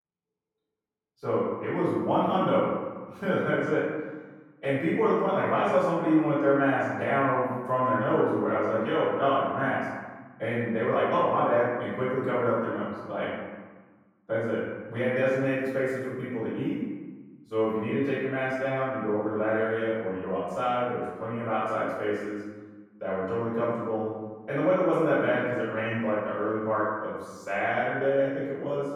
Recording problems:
room echo; strong; dies away in 1.2 s
off-mic speech; far
muffled; slightly; fading above 1.5 kHz

